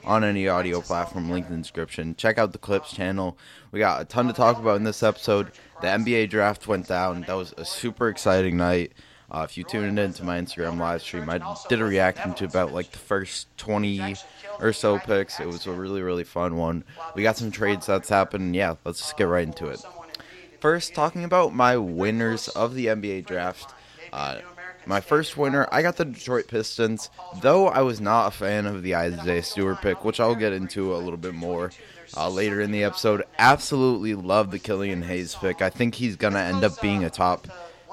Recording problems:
voice in the background; noticeable; throughout; 15 dB below the speech

